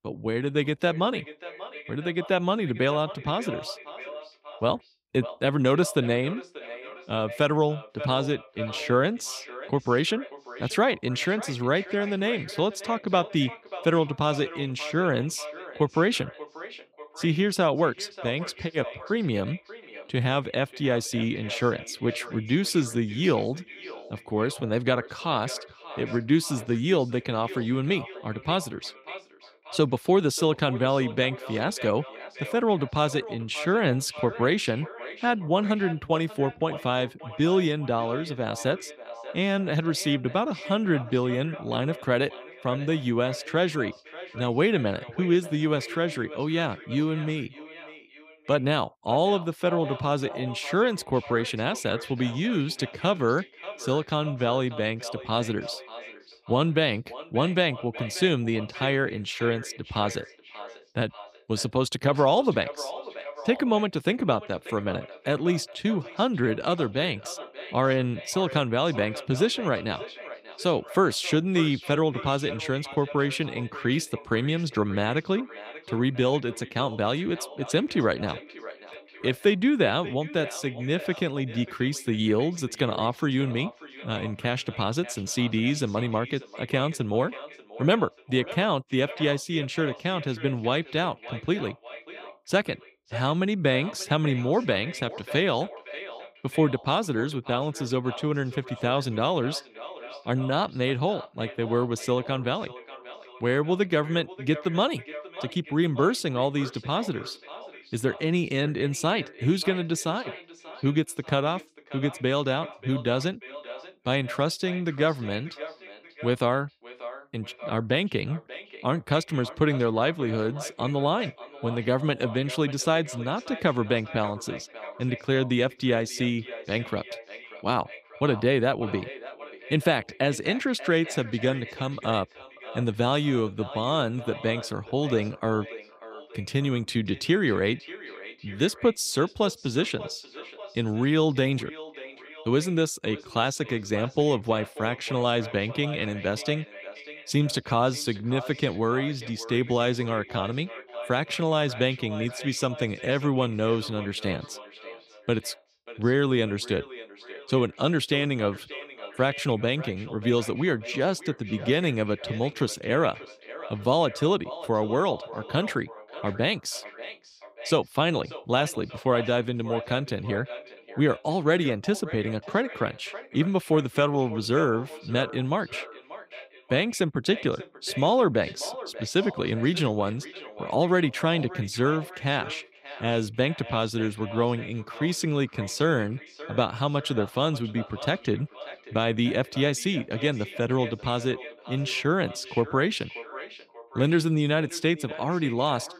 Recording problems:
echo of what is said; noticeable; throughout; 590 ms later, 15 dB below the speech

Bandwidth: 15.5 kHz